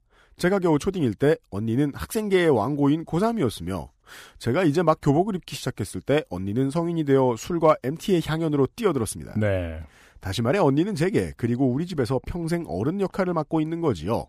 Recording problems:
none

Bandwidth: 15 kHz